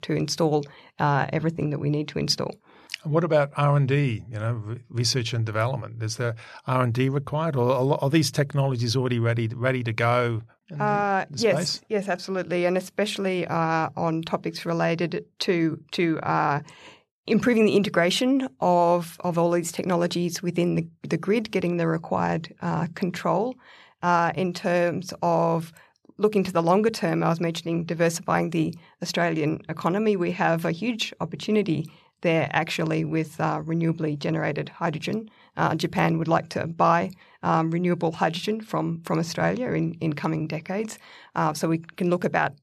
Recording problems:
none

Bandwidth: 13.5 kHz